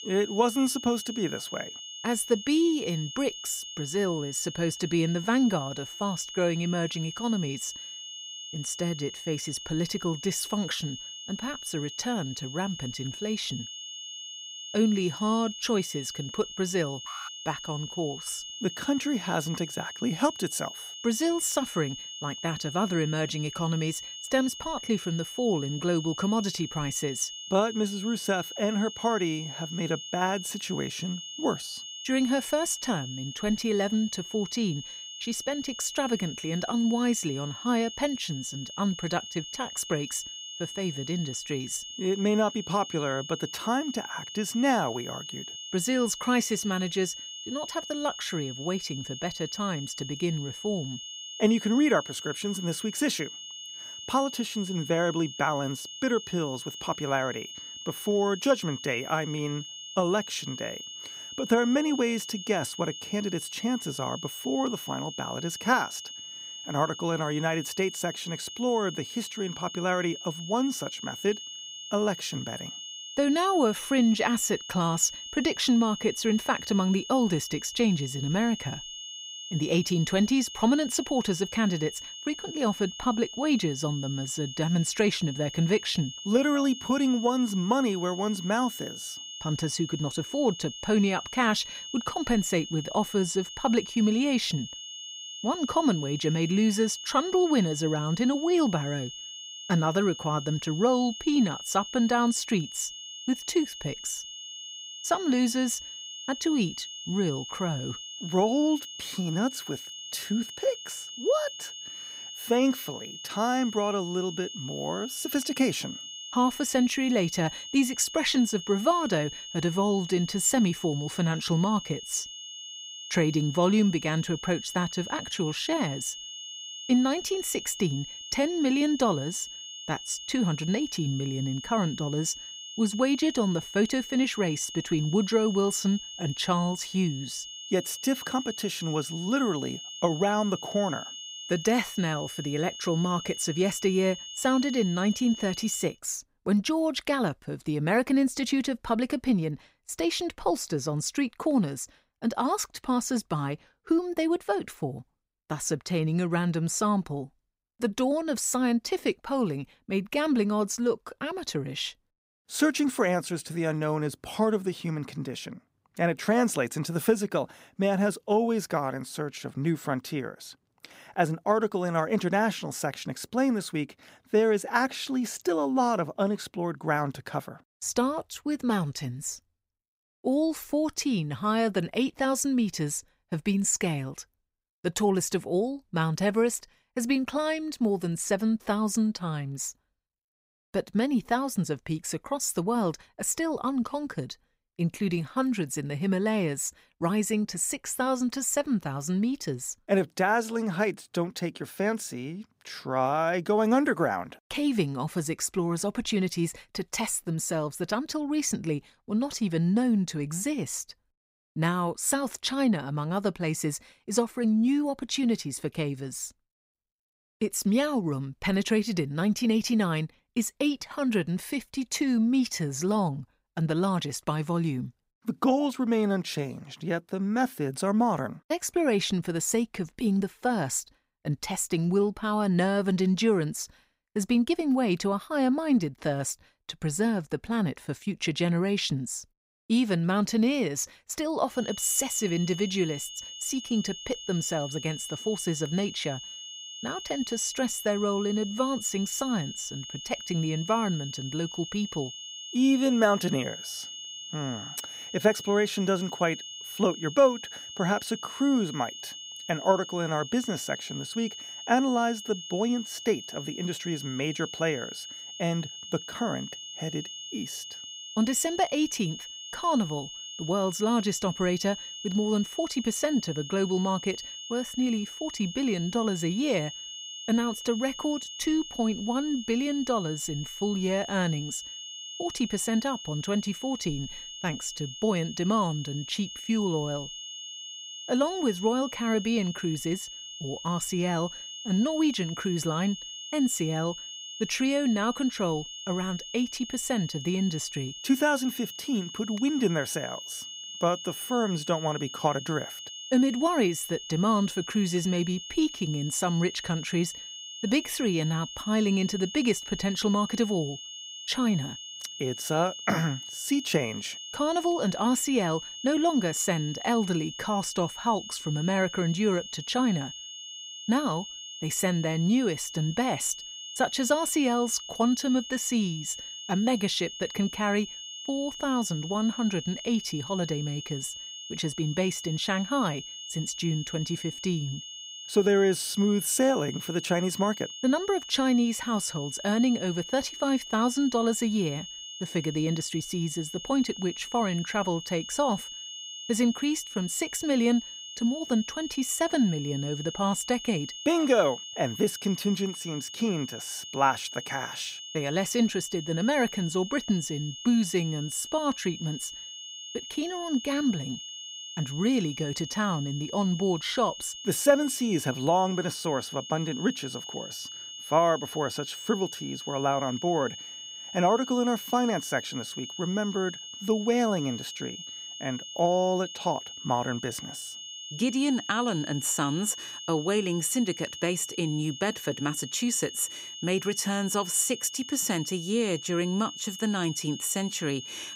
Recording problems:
high-pitched whine; loud; until 2:26 and from 4:02 on; 3 kHz, 10 dB below the speech
alarm; faint; at 17 s; peak 15 dB below the speech

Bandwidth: 15.5 kHz